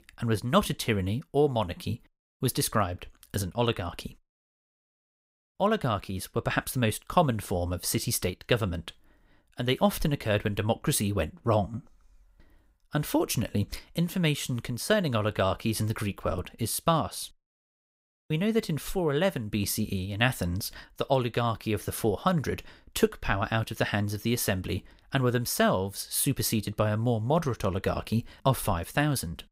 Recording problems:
none

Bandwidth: 15.5 kHz